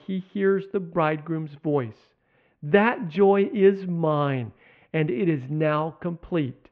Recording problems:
muffled; very; fading above 2.5 kHz

